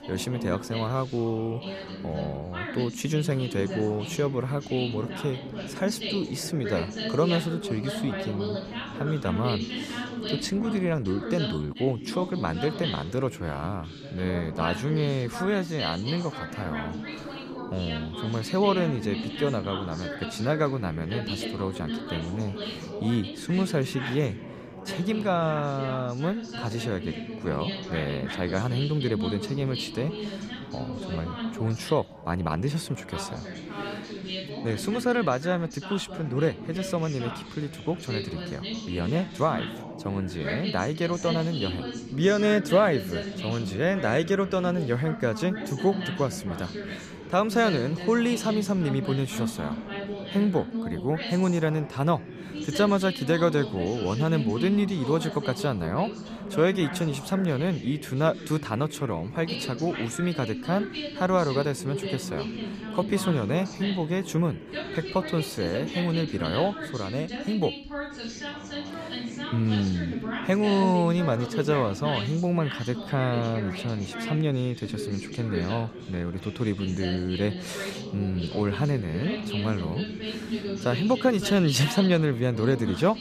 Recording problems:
background chatter; loud; throughout; 2 voices, 7 dB below the speech

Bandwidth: 14.5 kHz